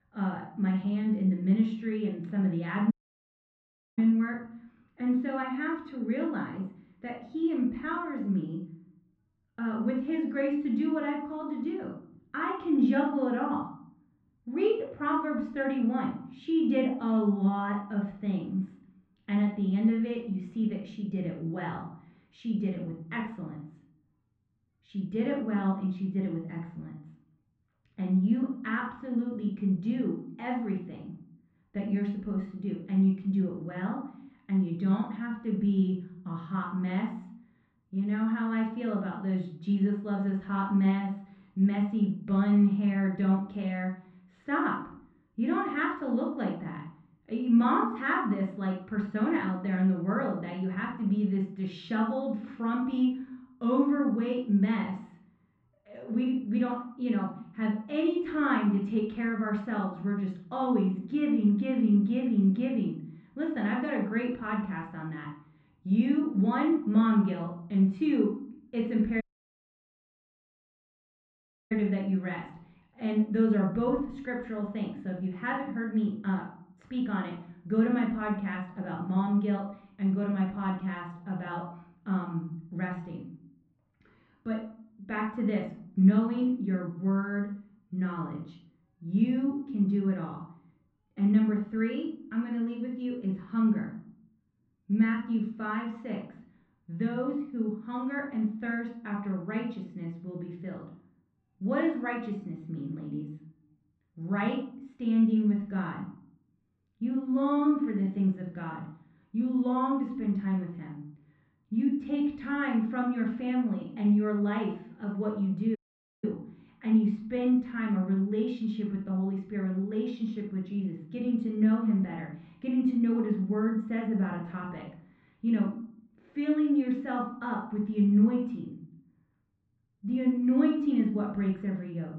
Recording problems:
muffled; very; fading above 2.5 kHz
room echo; slight; dies away in 0.5 s
off-mic speech; somewhat distant
audio cutting out; at 3 s for 1 s, at 1:09 for 2.5 s and at 1:56

